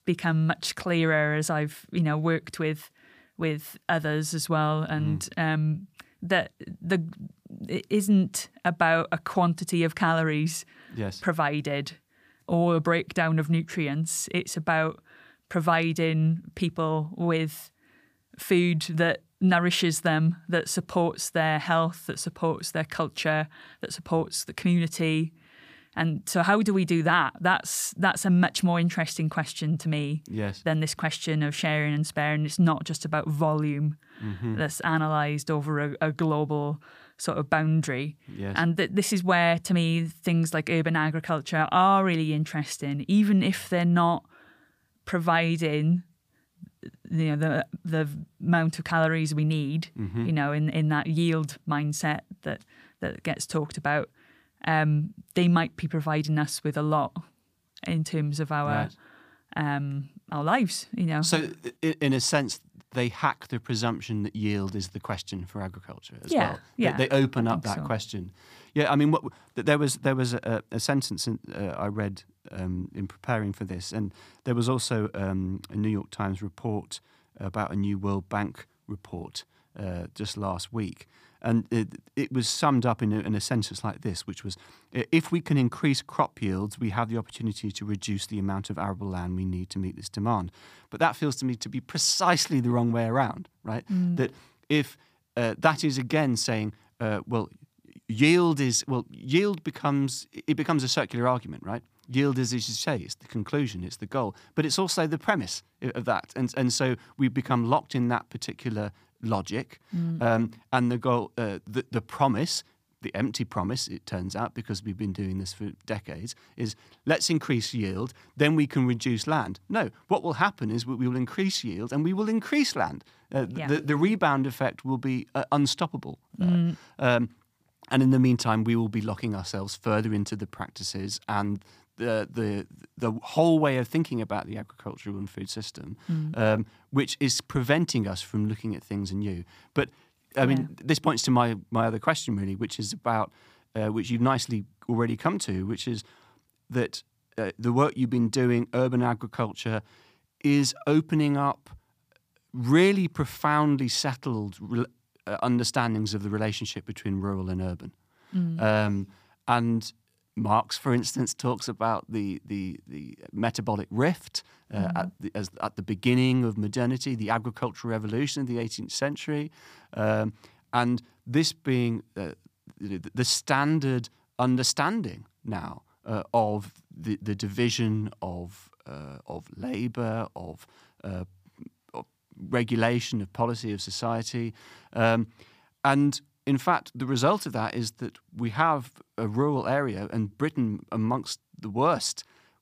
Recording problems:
none

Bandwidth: 15 kHz